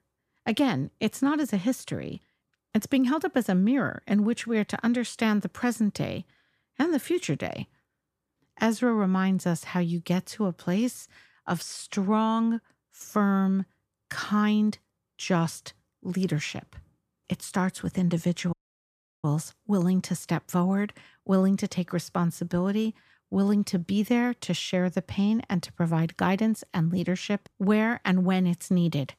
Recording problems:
audio cutting out; at 19 s for 0.5 s

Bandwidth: 14.5 kHz